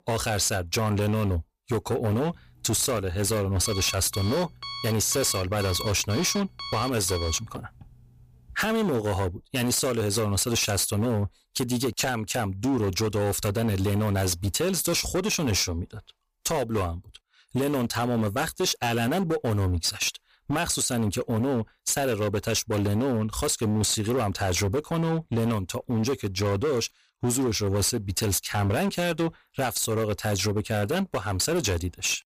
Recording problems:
distortion; slight; 17% of the sound clipped
alarm; noticeable; from 2.5 to 8.5 s; peak 8 dB below the speech

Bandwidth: 15 kHz